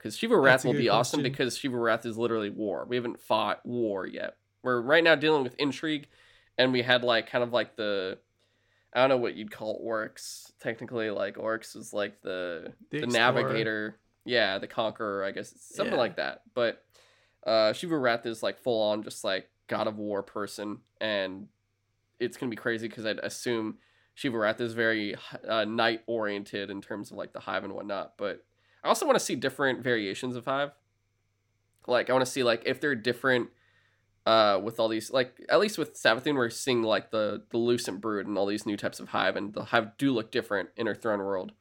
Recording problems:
none

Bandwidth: 17 kHz